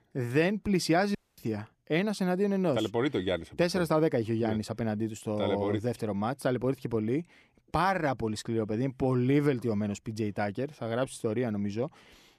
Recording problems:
audio cutting out; at 1 s

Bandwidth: 14 kHz